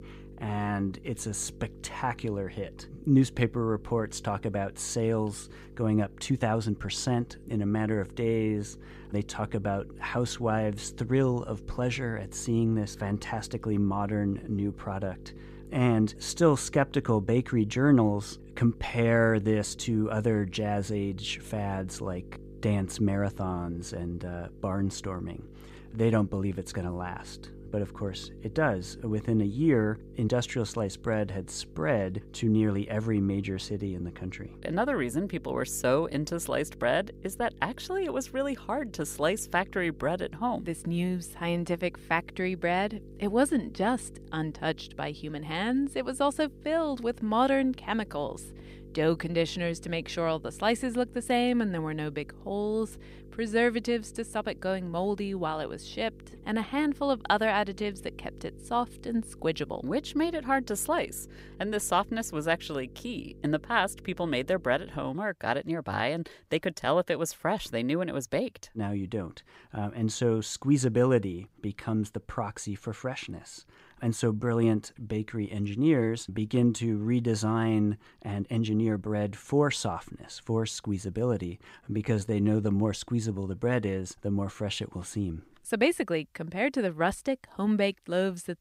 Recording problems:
electrical hum; faint; until 1:05; 50 Hz, 25 dB below the speech
uneven, jittery; strongly; from 6 s to 1:23

